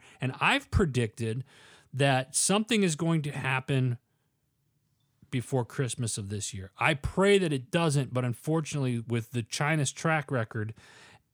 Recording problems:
none

